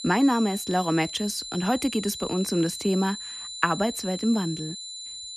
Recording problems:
high-pitched whine; loud; throughout; 4 kHz, 9 dB below the speech

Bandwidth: 14.5 kHz